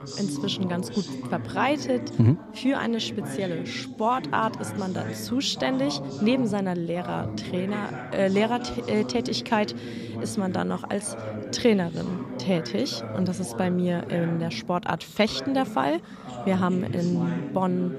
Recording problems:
background chatter; loud; throughout; 3 voices, 8 dB below the speech

